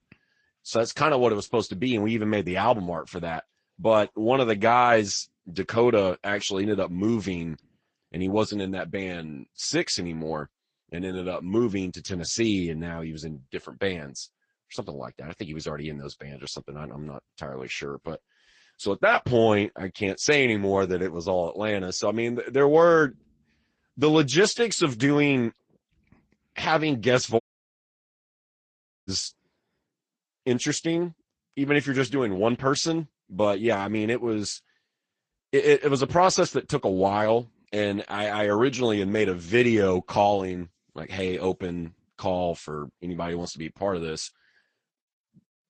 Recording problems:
garbled, watery; slightly; nothing above 8 kHz
audio cutting out; at 27 s for 1.5 s

